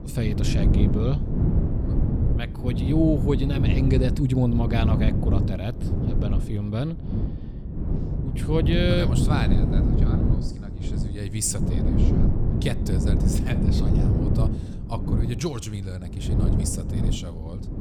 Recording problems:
wind noise on the microphone; heavy; 3 dB below the speech

